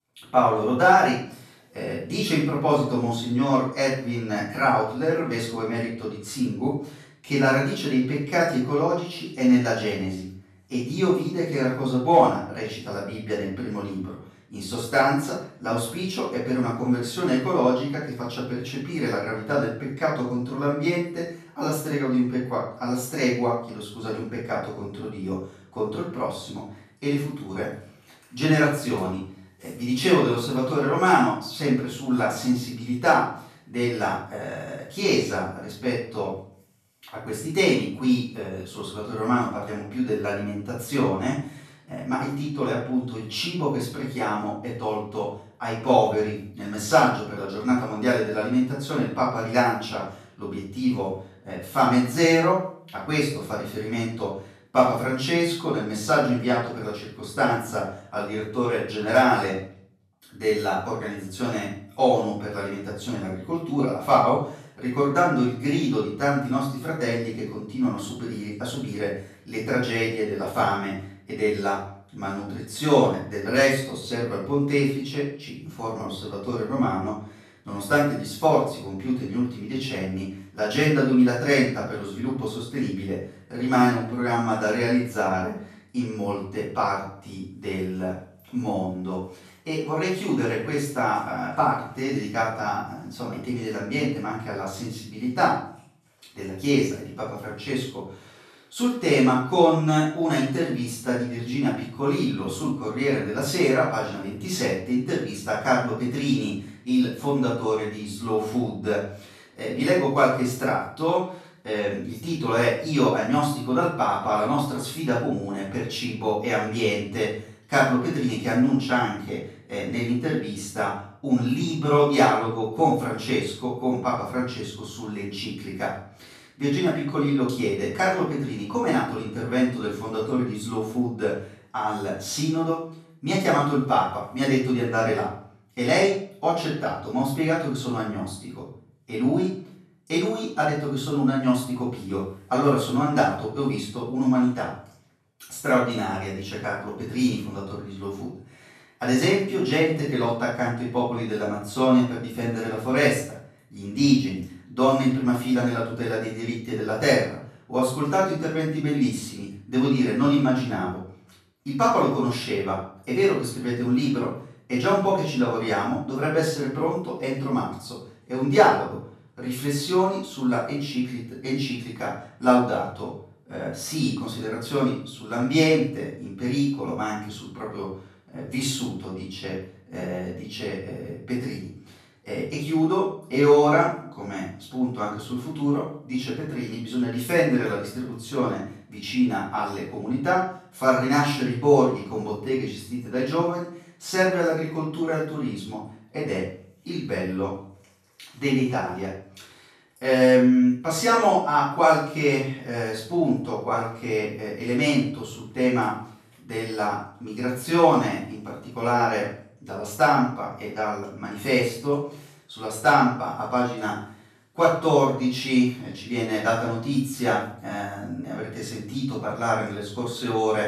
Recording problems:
off-mic speech; far
room echo; noticeable; dies away in 0.5 s

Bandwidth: 14 kHz